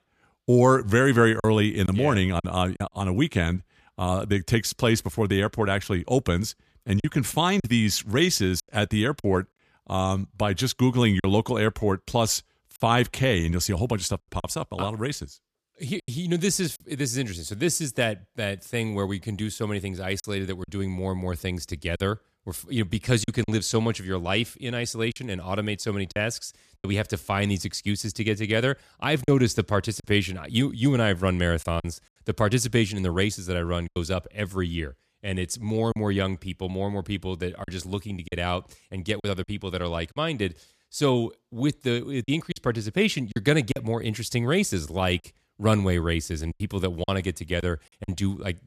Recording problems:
choppy; occasionally; 4% of the speech affected

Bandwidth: 14.5 kHz